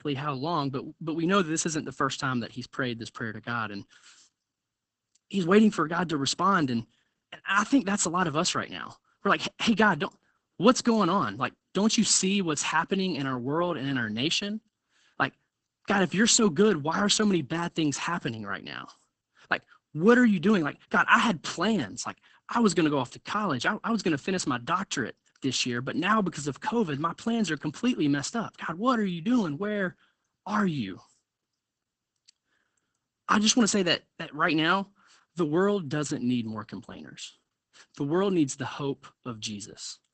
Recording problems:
garbled, watery; badly; nothing above 8 kHz

